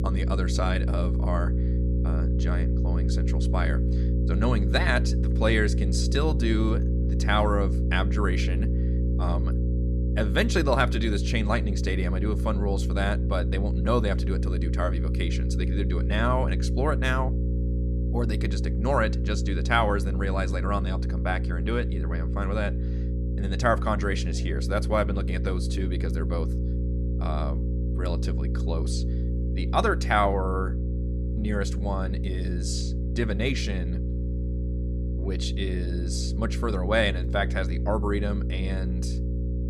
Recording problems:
electrical hum; loud; throughout; 60 Hz, 10 dB below the speech

